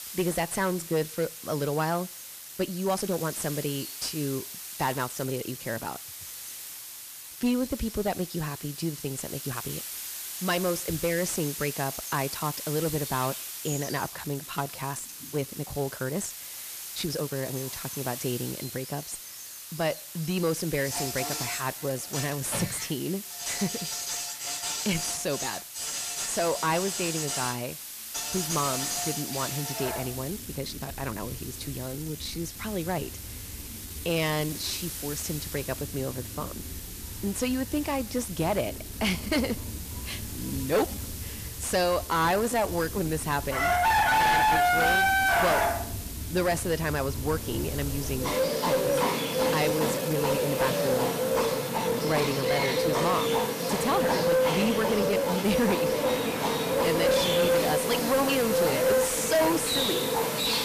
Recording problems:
distortion; heavy; 7 dB below the speech
animal sounds; very loud; throughout; 2 dB above the speech
hiss; loud; throughout; 7 dB below the speech
uneven, jittery; strongly; from 2.5 to 55 s

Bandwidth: 14.5 kHz